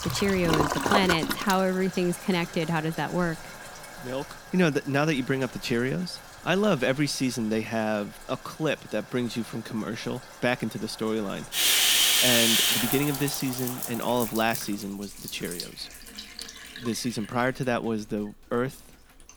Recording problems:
household noises; very loud; throughout; 4 dB above the speech

